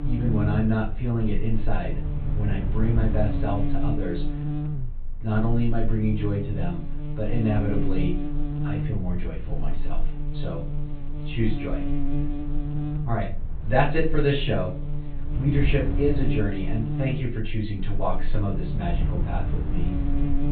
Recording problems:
off-mic speech; far
high frequencies cut off; severe; nothing above 4 kHz
room echo; slight; dies away in 0.3 s
wind noise on the microphone; occasional gusts; 15 dB below the speech
electrical hum; very faint; throughout; 60 Hz, 8 dB below the speech

